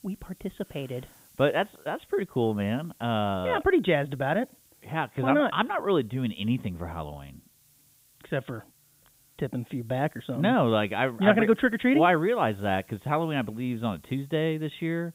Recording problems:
high frequencies cut off; severe; nothing above 4 kHz
hiss; faint; throughout; 30 dB below the speech

